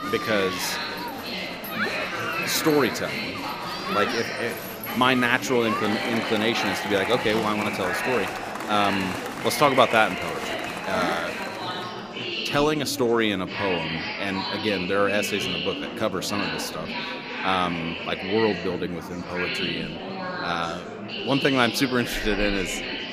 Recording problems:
murmuring crowd; loud; throughout; 4 dB below the speech

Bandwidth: 15 kHz